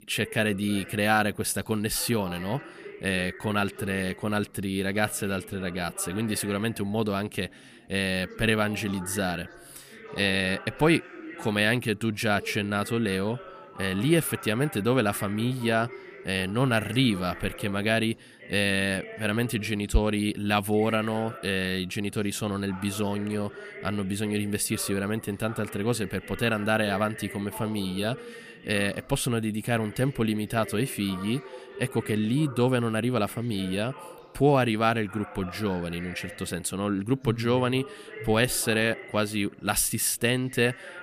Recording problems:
background chatter; noticeable; throughout; 3 voices, 15 dB below the speech

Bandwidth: 15 kHz